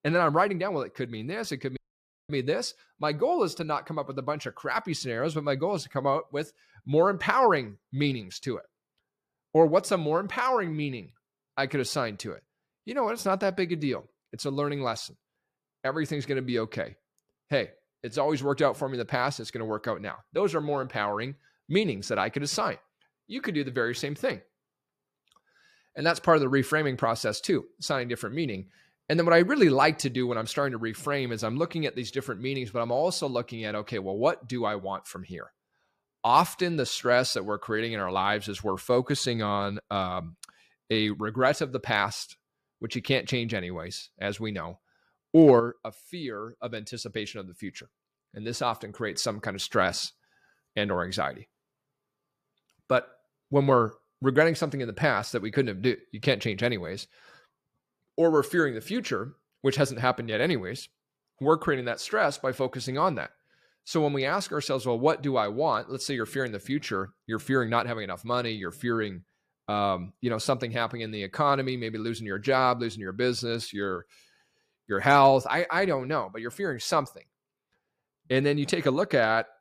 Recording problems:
audio cutting out; at 2 s for 0.5 s

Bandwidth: 14.5 kHz